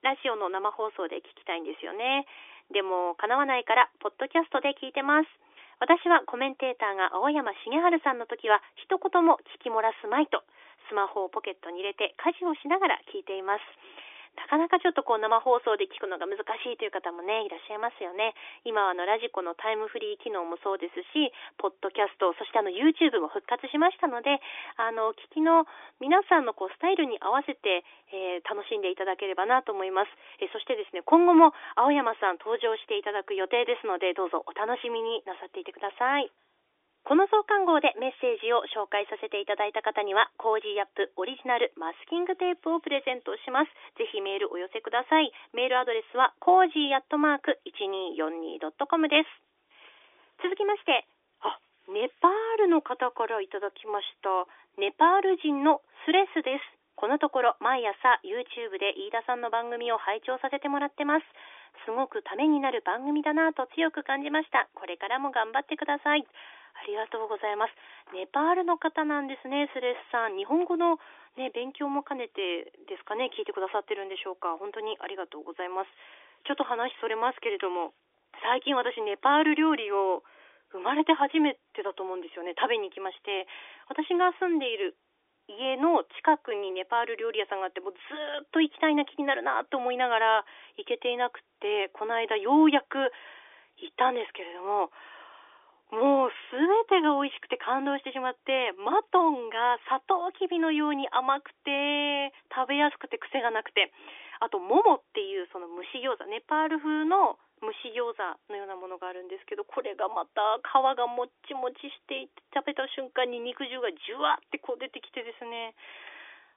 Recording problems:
phone-call audio; nothing above 3.5 kHz

